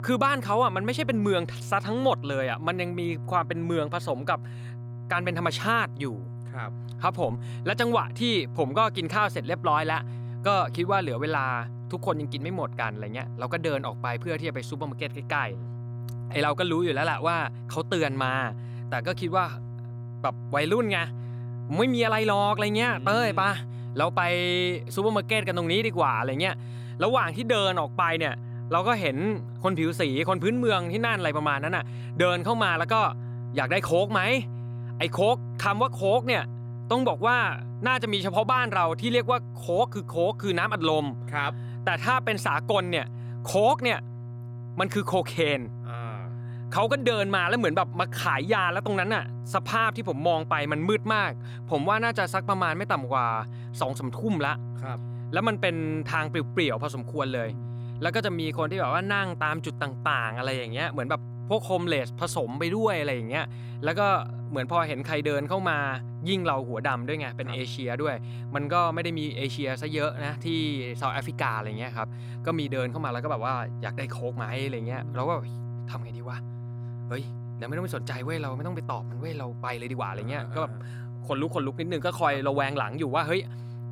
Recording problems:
electrical hum; faint; throughout; 60 Hz, 20 dB below the speech

